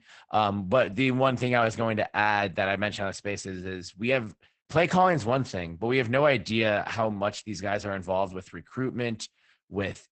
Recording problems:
garbled, watery; badly; nothing above 8 kHz

